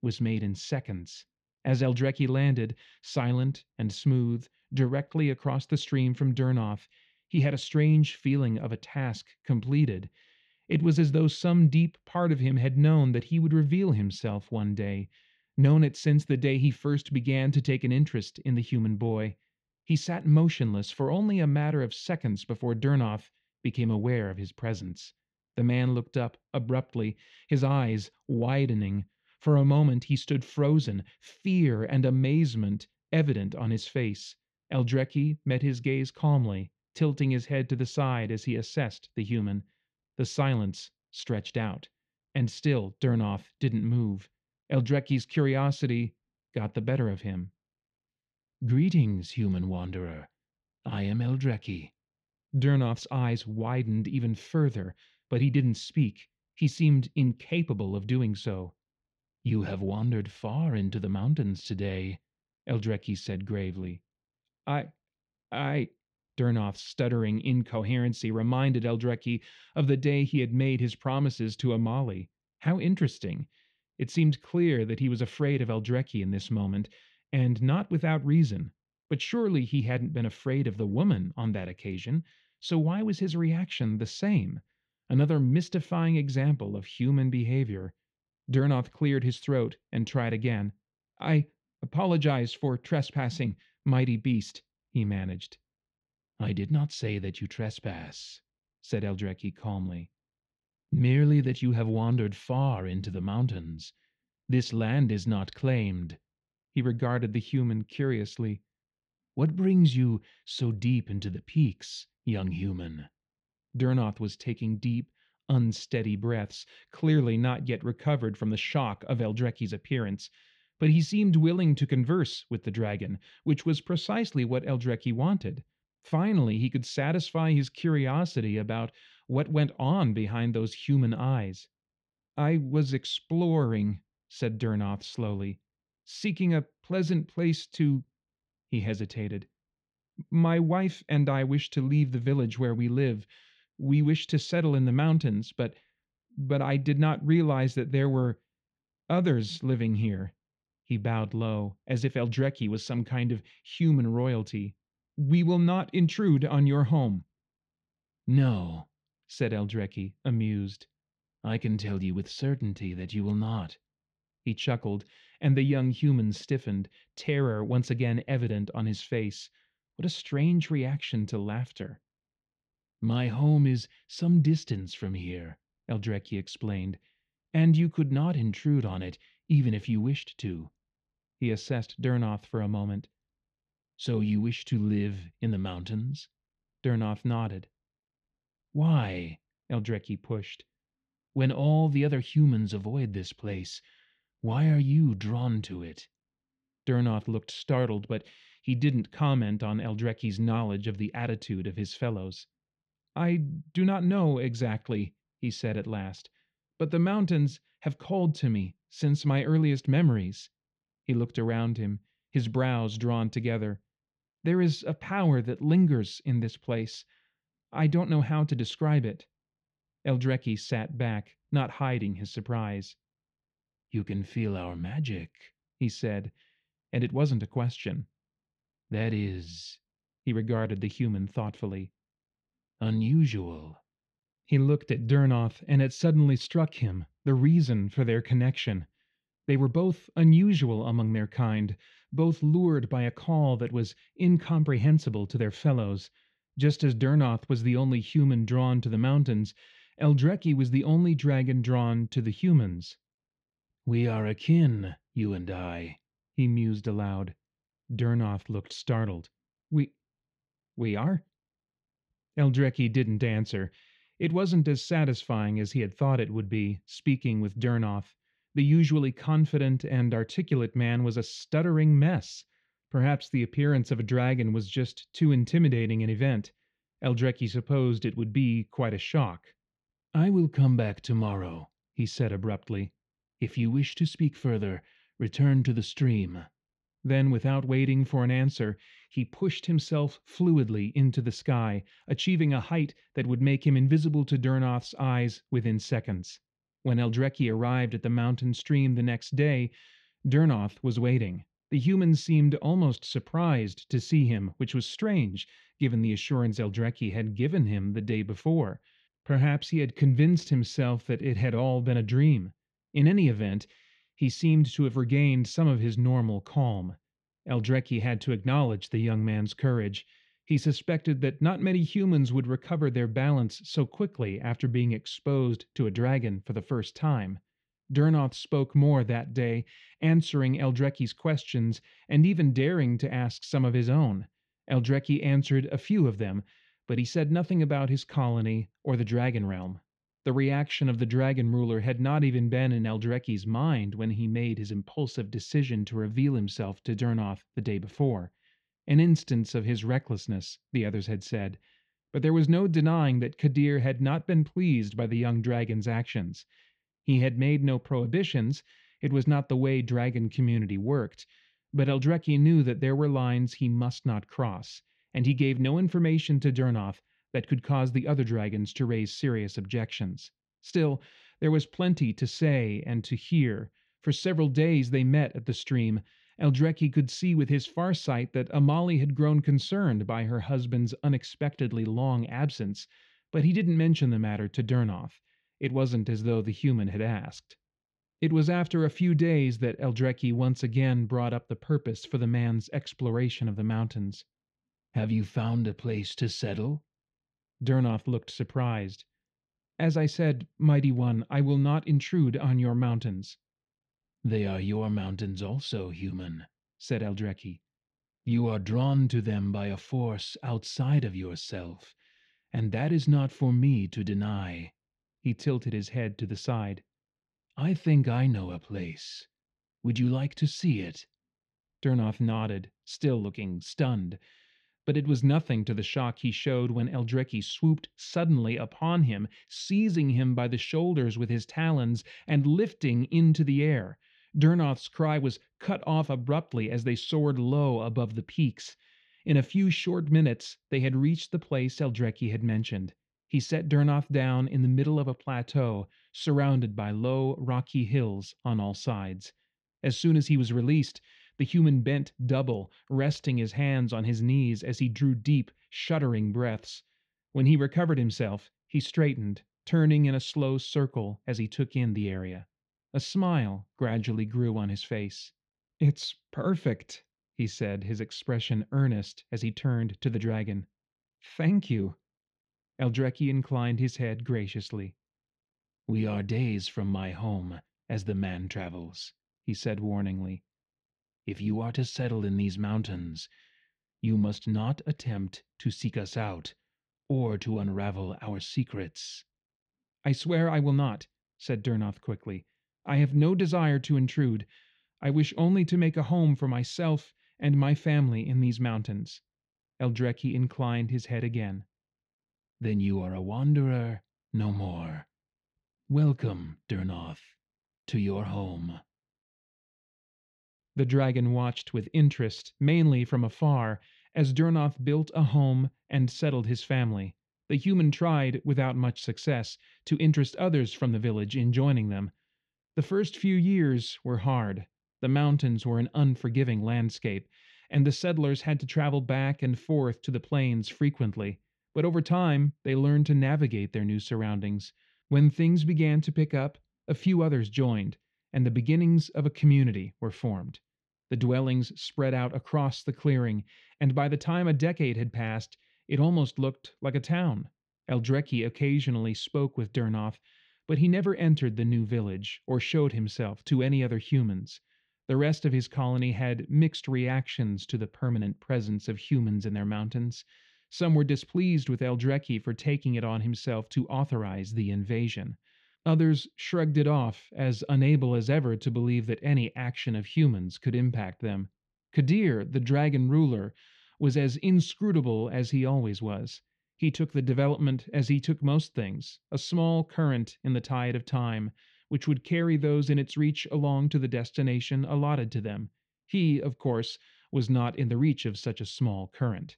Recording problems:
muffled; slightly; fading above 3.5 kHz

